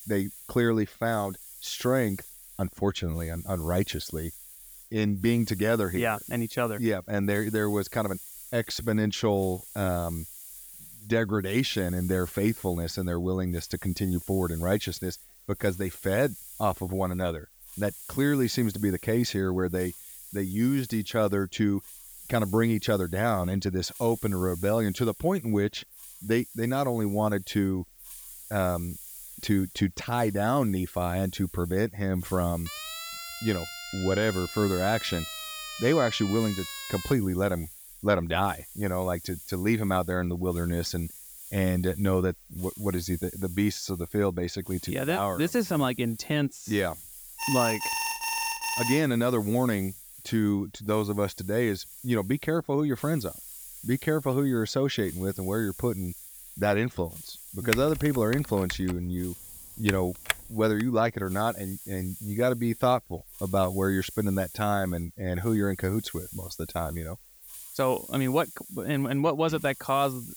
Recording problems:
hiss; noticeable; throughout; 15 dB below the speech
siren; noticeable; from 33 to 37 s; peak 8 dB below the speech
alarm; noticeable; from 47 to 49 s; peak level with the speech
keyboard typing; noticeable; from 58 s to 1:01; peak 3 dB below the speech

